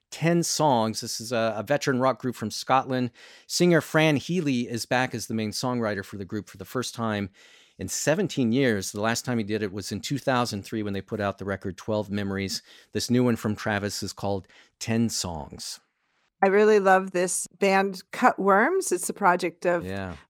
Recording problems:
none

